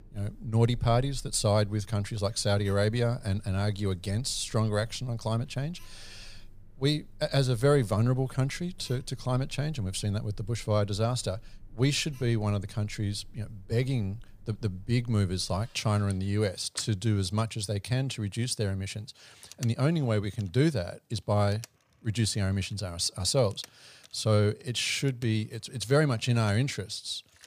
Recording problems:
alarms or sirens; faint; throughout; 25 dB below the speech

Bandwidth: 15 kHz